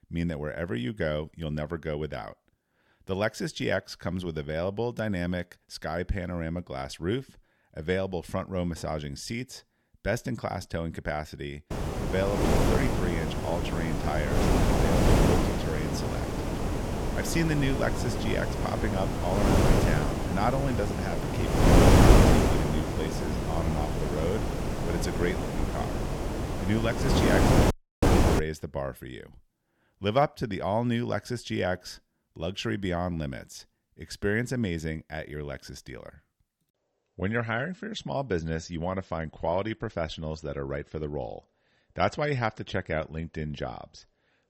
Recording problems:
wind noise on the microphone; heavy; from 12 to 28 s; 3 dB above the speech
audio cutting out; at 28 s

